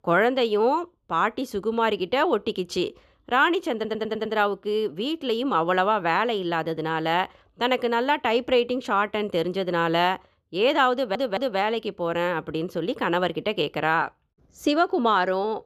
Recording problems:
audio stuttering; at 4 s and at 11 s

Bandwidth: 14 kHz